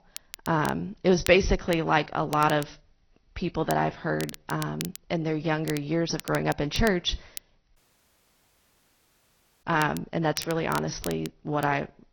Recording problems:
high frequencies cut off; noticeable; nothing above 6 kHz
garbled, watery; slightly
crackle, like an old record; noticeable; 15 dB below the speech
audio cutting out; at 8 s for 2 s

